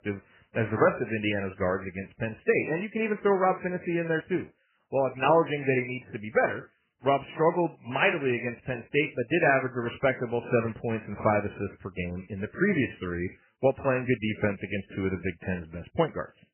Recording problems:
garbled, watery; badly; nothing above 3 kHz

